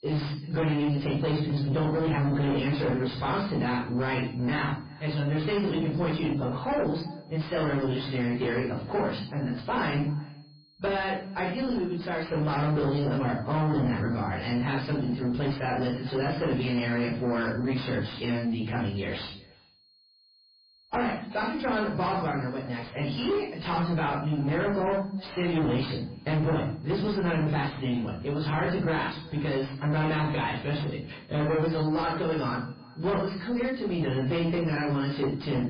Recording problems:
distortion; heavy; 6 dB below the speech
off-mic speech; far
garbled, watery; badly
echo of what is said; faint; throughout; 370 ms later, 25 dB below the speech
room echo; slight; dies away in 0.4 s
high-pitched whine; faint; throughout; 4.5 kHz, 30 dB below the speech

